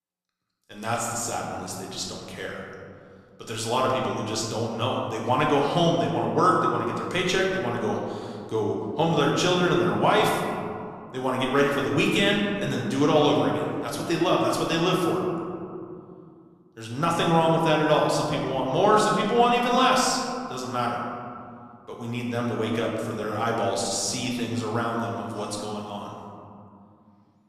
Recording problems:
room echo; noticeable; dies away in 2.2 s
off-mic speech; somewhat distant

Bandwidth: 14.5 kHz